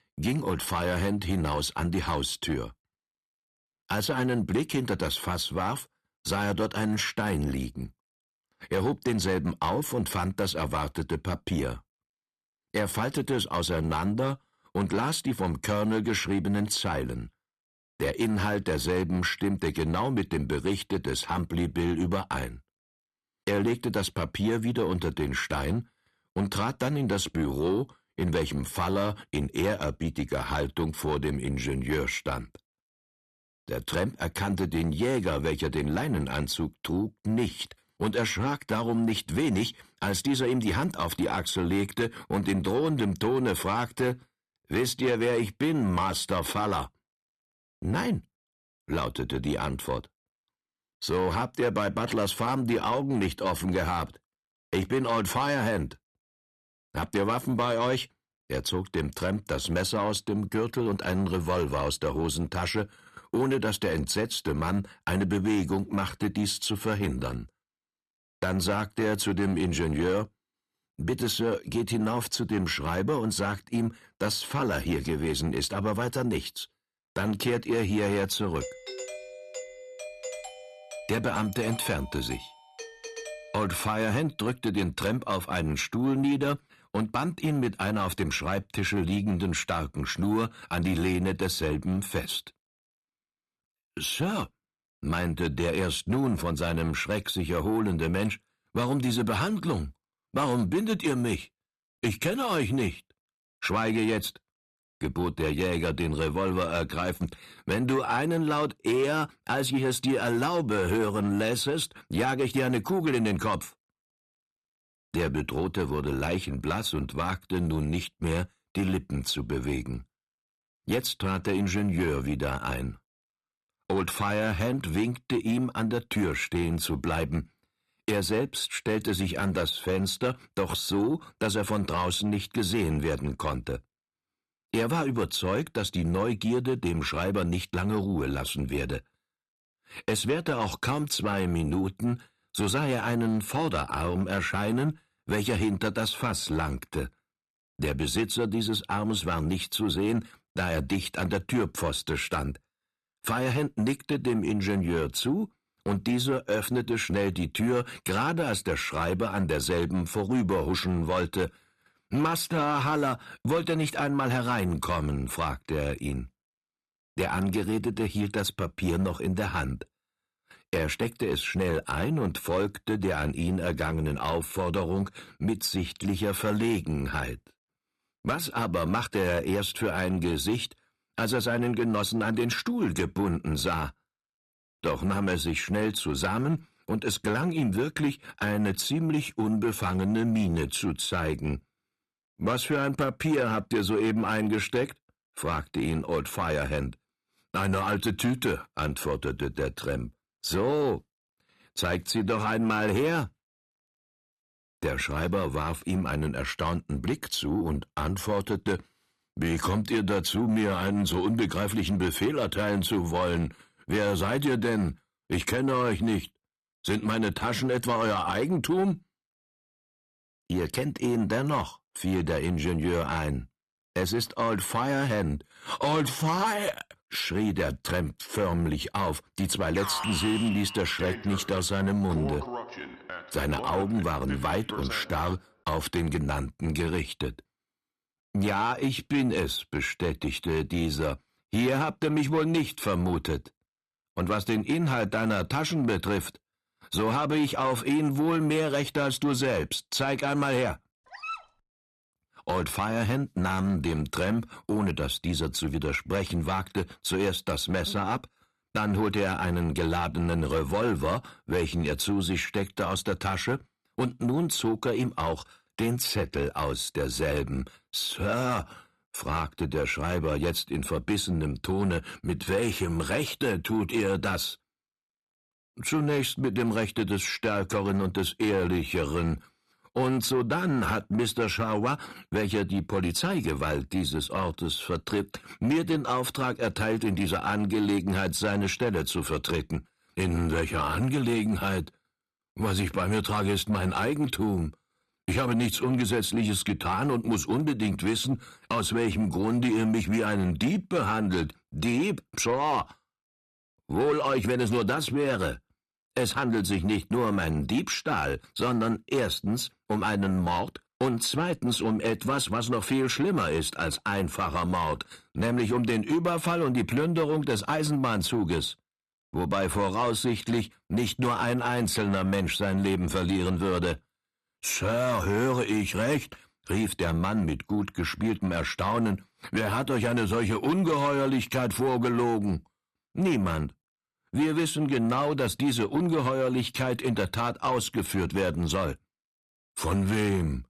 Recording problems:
distortion; slight; 10 dB below the speech
doorbell; noticeable; from 1:19 to 1:24; peak 9 dB below the speech
alarm; noticeable; from 3:50 to 3:55; peak 2 dB below the speech
dog barking; noticeable; at 4:11; peak 8 dB below the speech

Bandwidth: 13.5 kHz